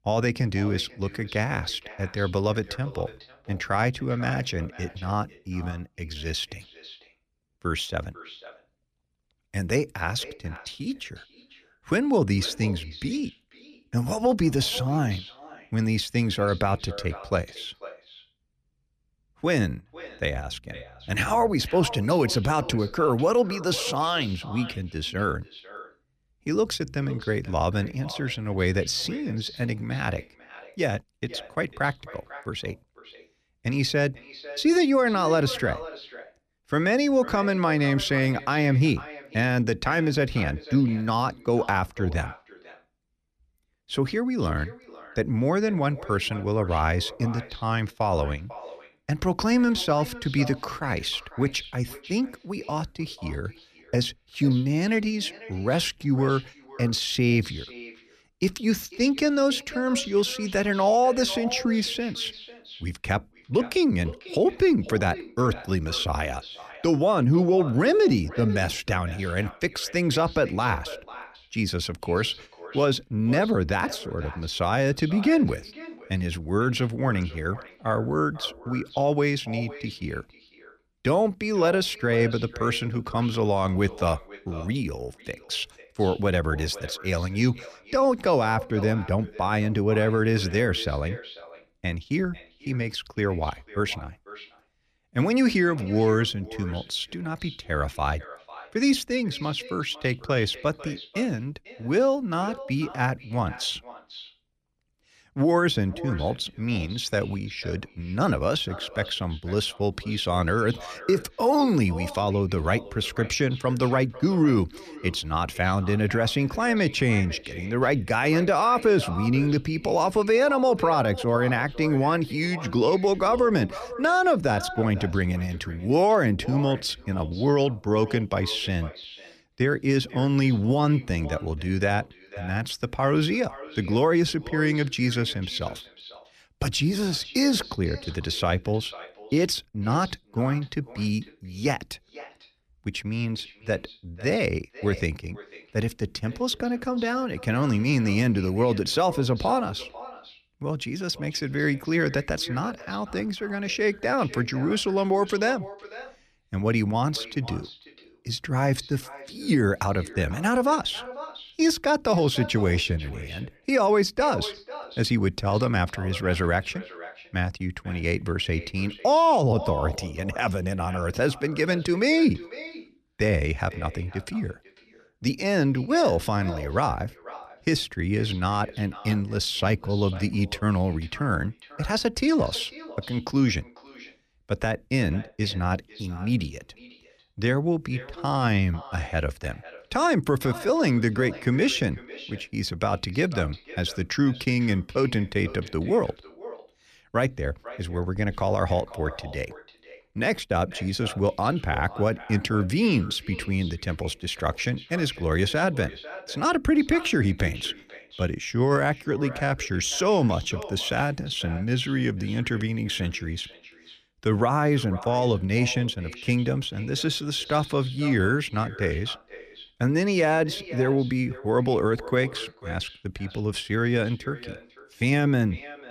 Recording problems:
echo of what is said; noticeable; throughout; 490 ms later, 15 dB below the speech

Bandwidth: 14.5 kHz